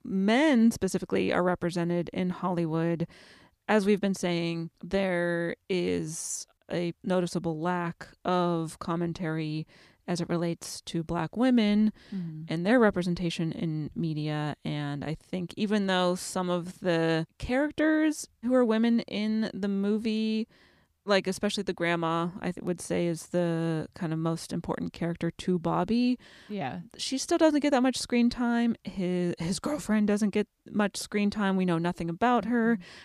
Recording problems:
none

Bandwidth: 15 kHz